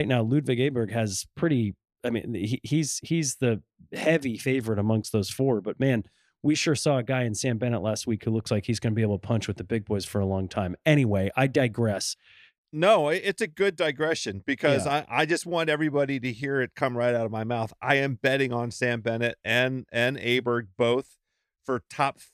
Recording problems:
abrupt cut into speech; at the start

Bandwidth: 14.5 kHz